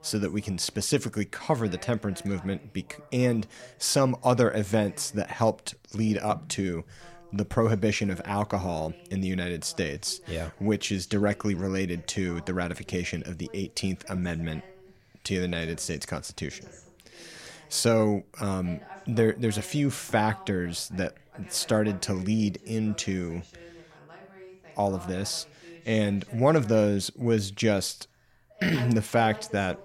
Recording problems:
voice in the background; faint; throughout; 20 dB below the speech

